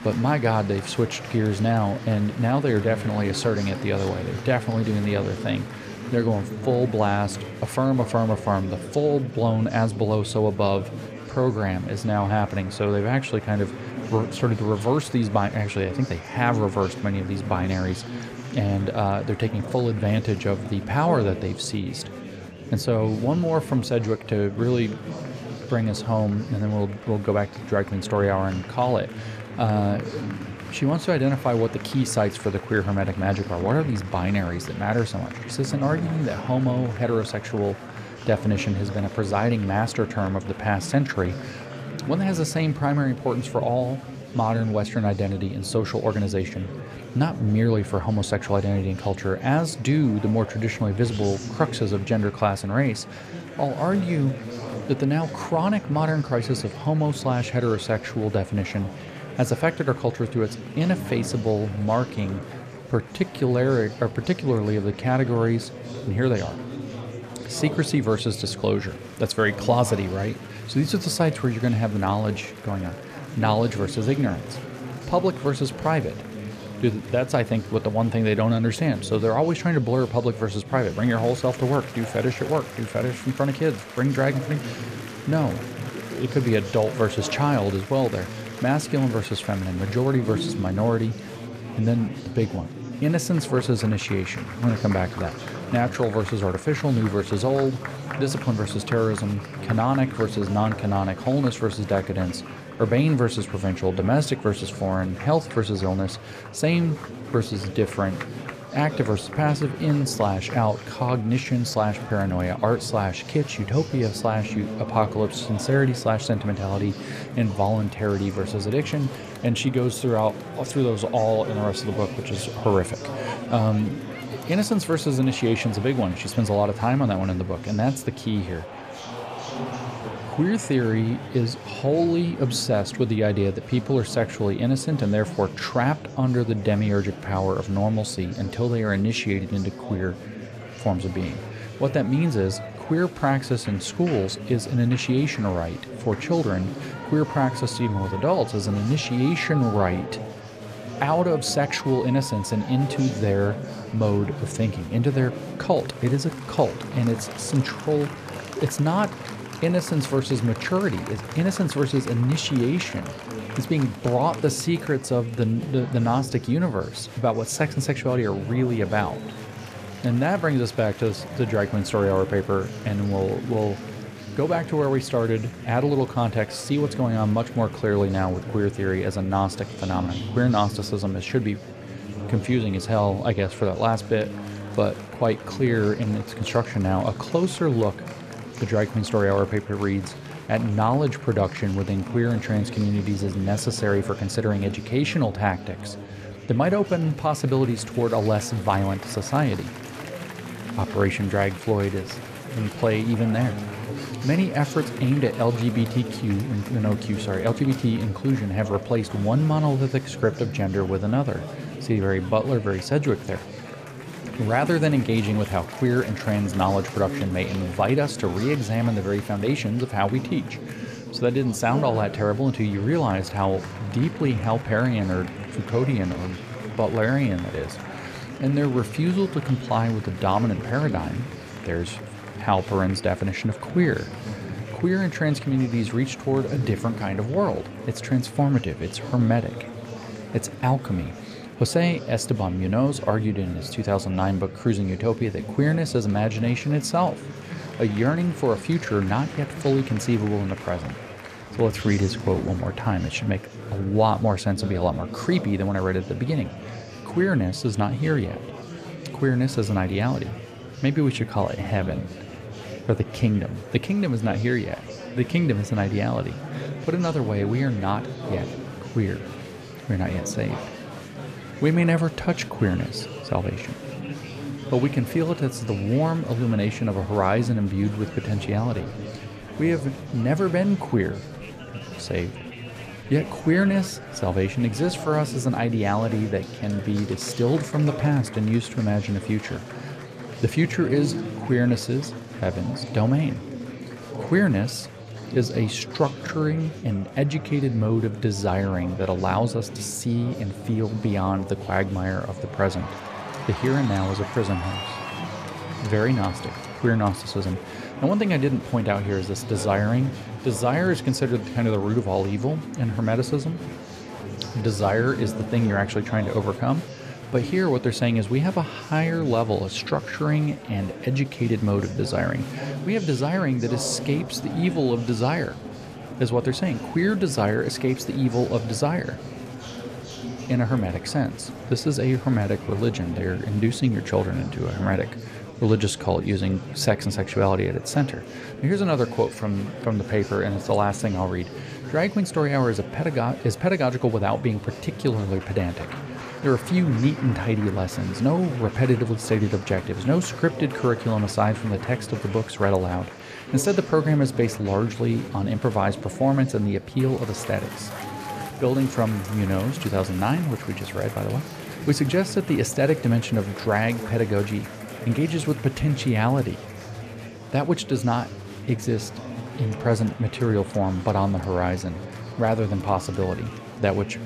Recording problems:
murmuring crowd; noticeable; throughout; 10 dB below the speech

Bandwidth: 14.5 kHz